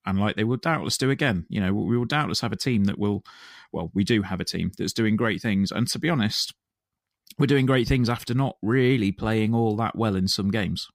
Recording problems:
none

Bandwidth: 15.5 kHz